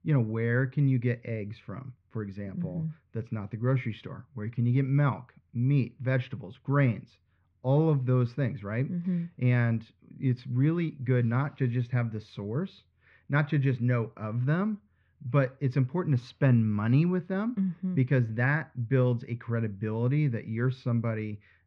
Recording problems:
muffled; very; fading above 2 kHz

